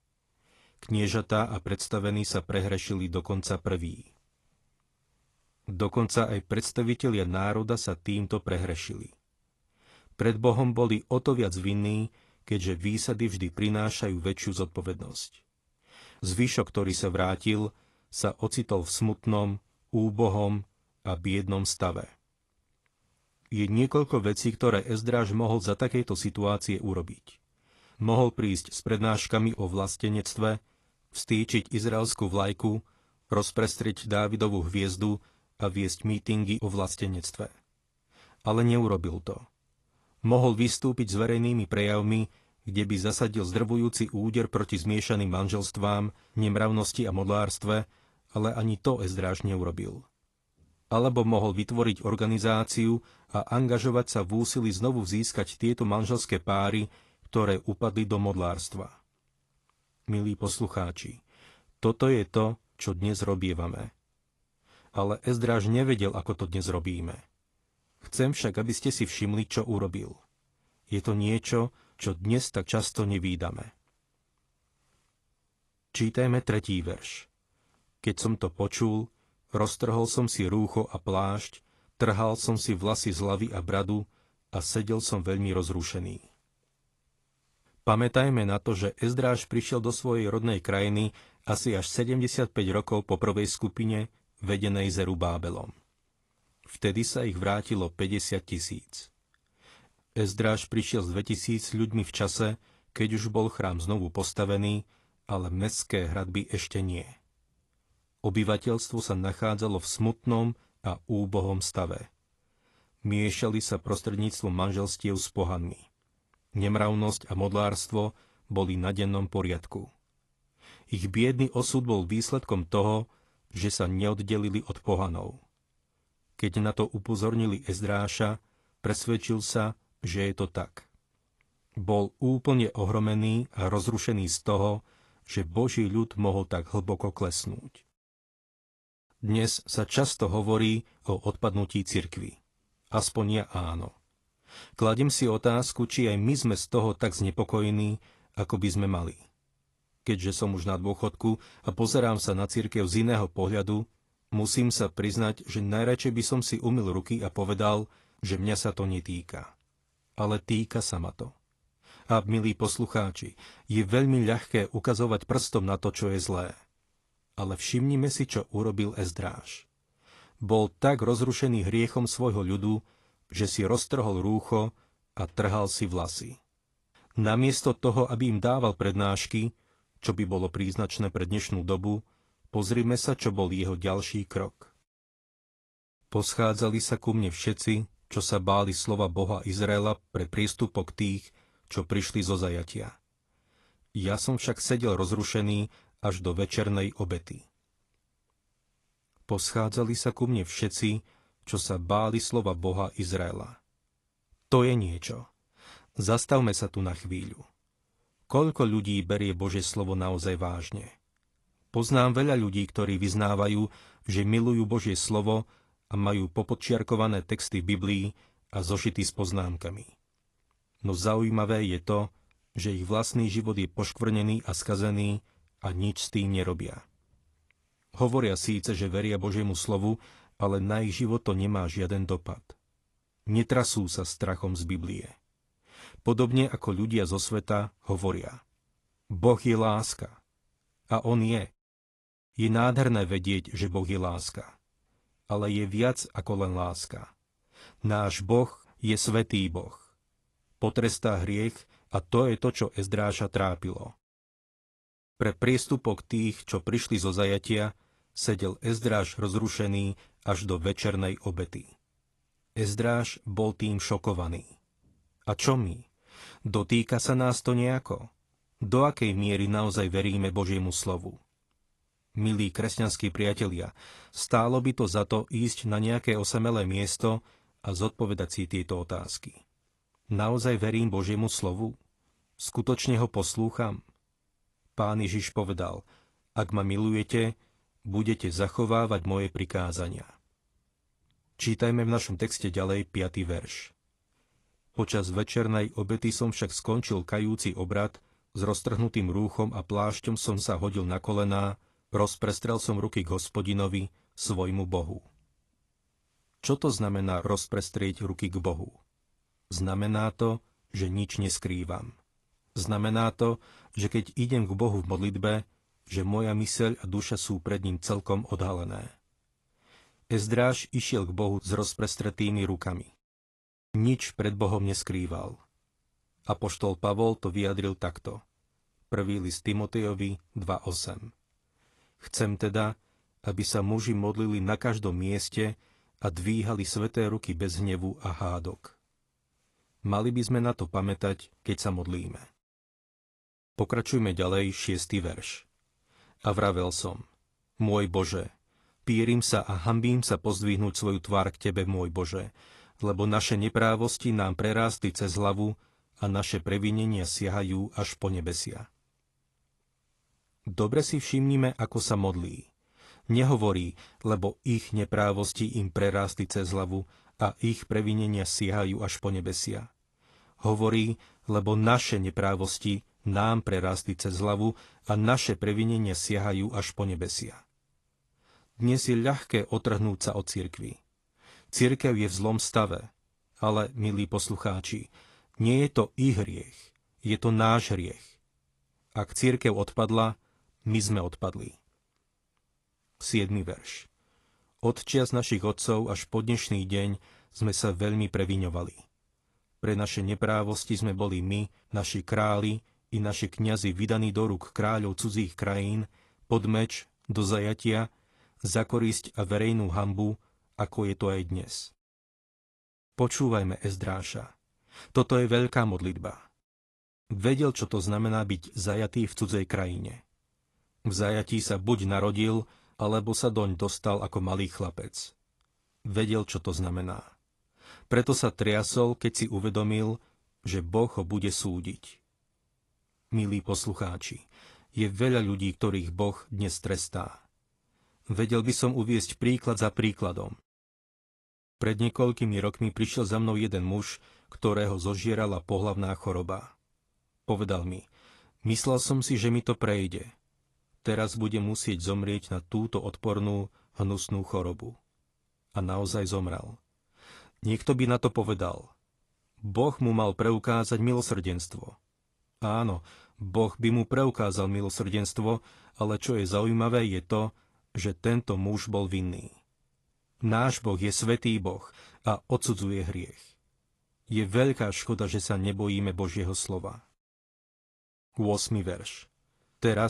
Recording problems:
garbled, watery; slightly; nothing above 11 kHz
abrupt cut into speech; at the end

